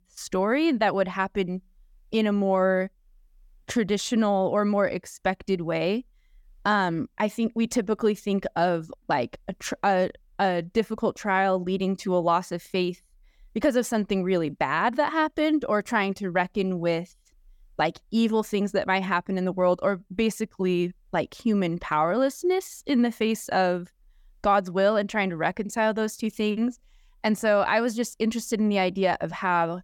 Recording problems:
none

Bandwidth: 17.5 kHz